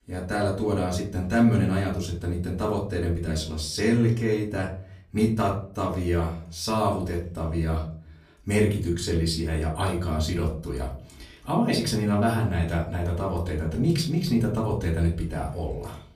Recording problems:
off-mic speech; far
room echo; slight; dies away in 0.4 s

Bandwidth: 14.5 kHz